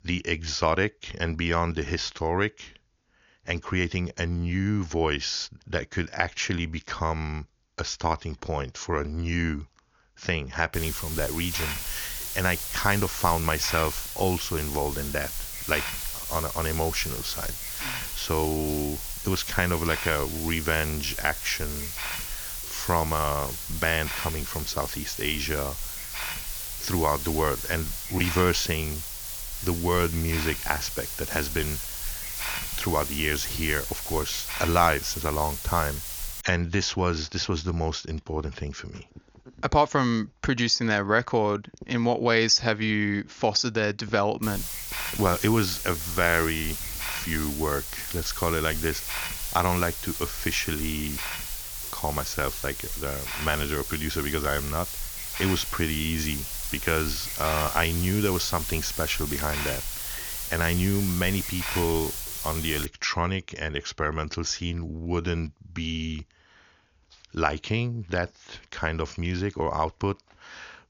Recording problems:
high frequencies cut off; noticeable; nothing above 7 kHz
hiss; loud; from 11 to 36 s and from 44 s to 1:03; 4 dB below the speech

